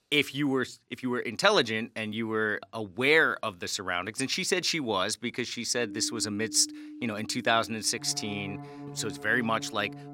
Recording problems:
background music; noticeable; from 6 s on; 15 dB below the speech

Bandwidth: 16 kHz